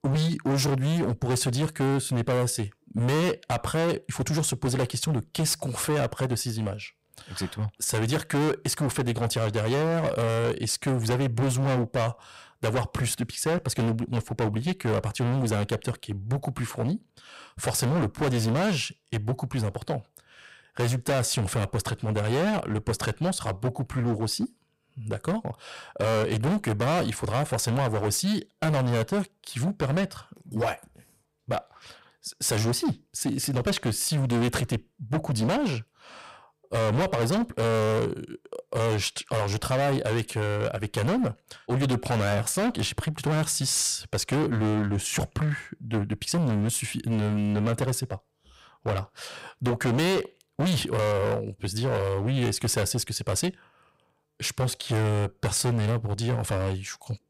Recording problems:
distortion; heavy; 19% of the sound clipped

